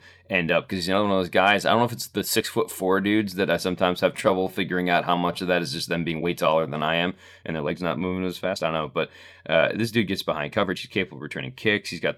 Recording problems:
uneven, jittery; strongly; from 0.5 to 11 s

